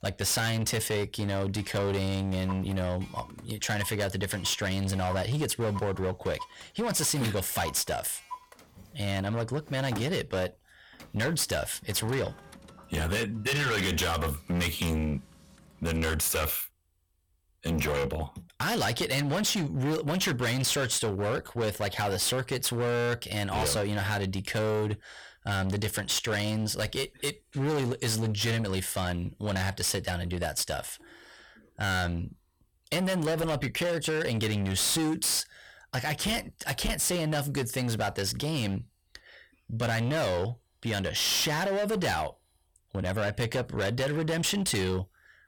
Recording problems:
distortion; heavy; 19% of the sound clipped
household noises; noticeable; until 16 s; 20 dB below the speech

